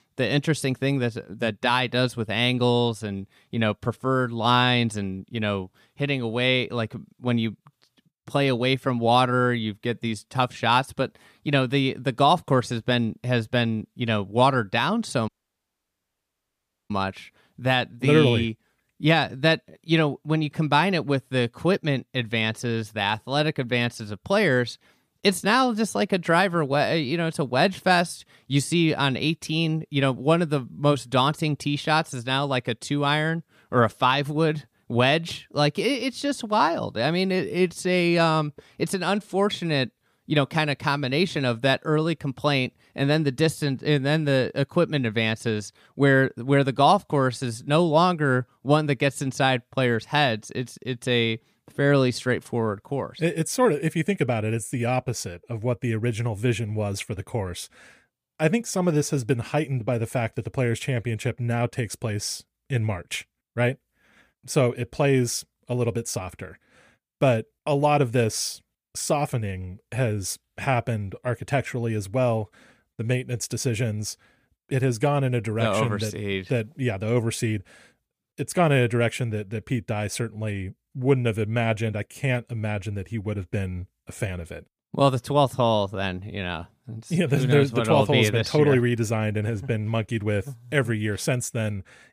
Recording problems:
audio cutting out; at 15 s for 1.5 s

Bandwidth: 15 kHz